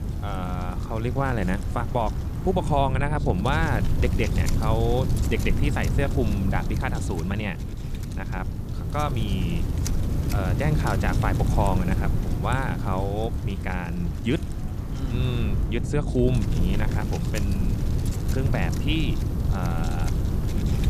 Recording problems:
wind noise on the microphone; heavy; 7 dB below the speech

